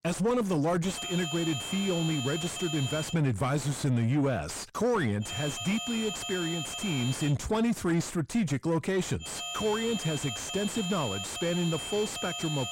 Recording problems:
distortion; heavy; 5 dB below the speech
high-pitched whine; loud; from 1 to 3 s, from 5.5 to 7.5 s and from 9.5 s on; 3 kHz, 4 dB below the speech

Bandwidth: 16 kHz